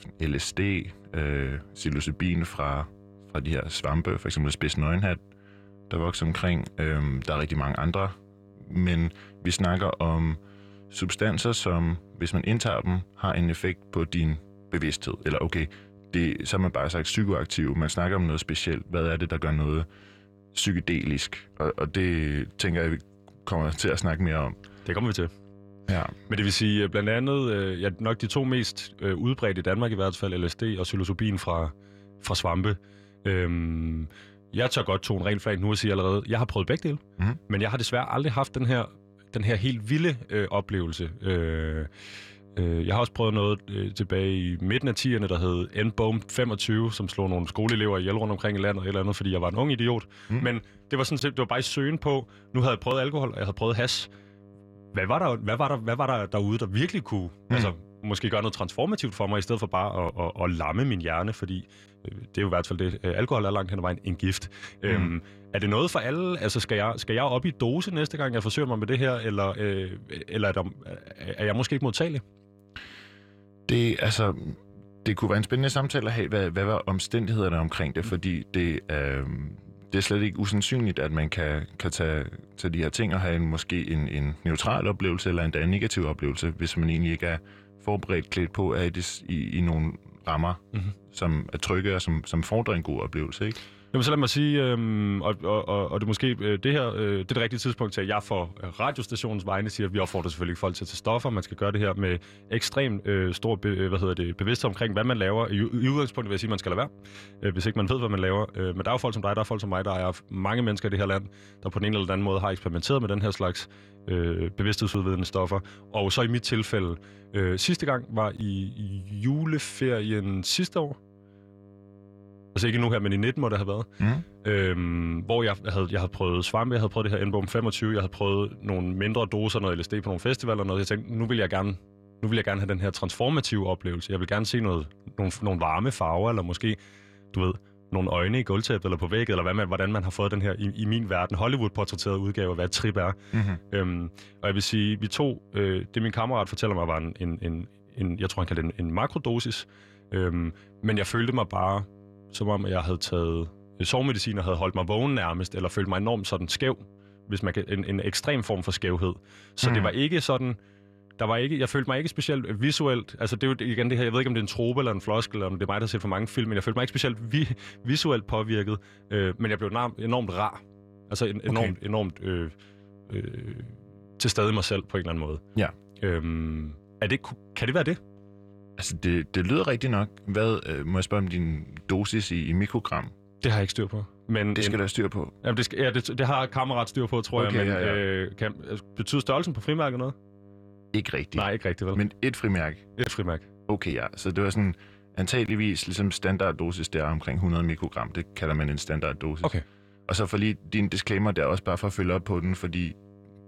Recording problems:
electrical hum; faint; throughout; 50 Hz, 30 dB below the speech

